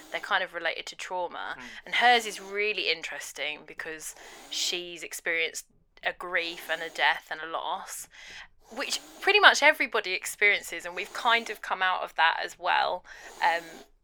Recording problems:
thin; very; fading below 600 Hz
hiss; faint; throughout; 25 dB below the speech

